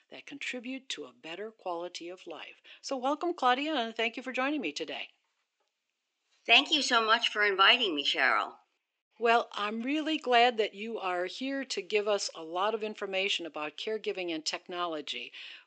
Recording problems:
thin; somewhat; fading below 350 Hz
high frequencies cut off; noticeable; nothing above 8 kHz

